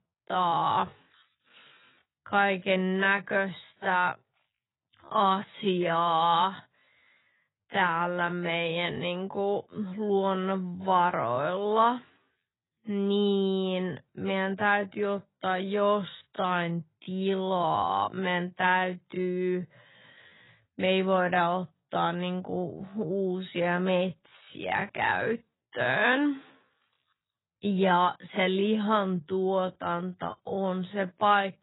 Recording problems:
garbled, watery; badly; nothing above 4 kHz
wrong speed, natural pitch; too slow; 0.5 times normal speed

